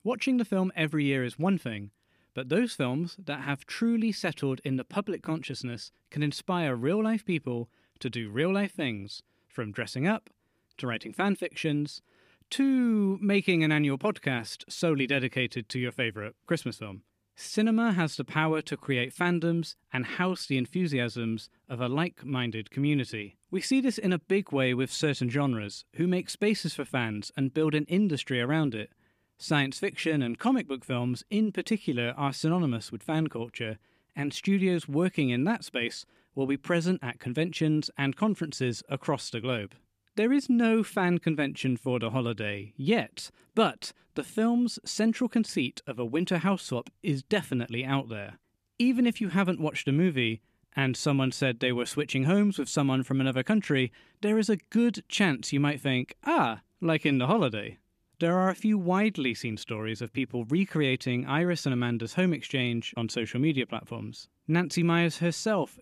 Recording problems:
none

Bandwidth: 14.5 kHz